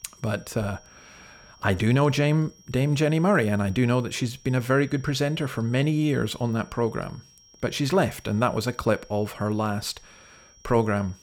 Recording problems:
high-pitched whine; faint; throughout; 5.5 kHz, 25 dB below the speech

